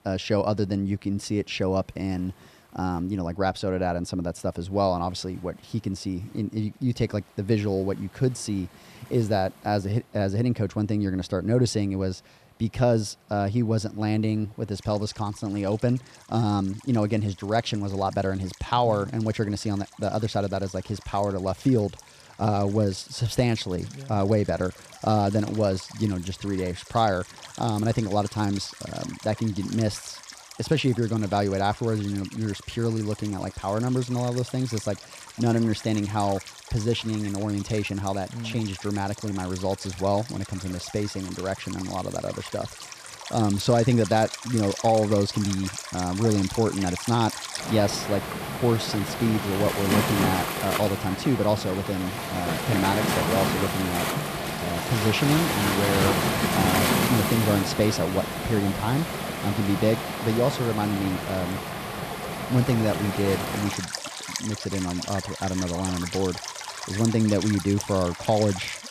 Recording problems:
rain or running water; loud; throughout; 4 dB below the speech

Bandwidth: 14.5 kHz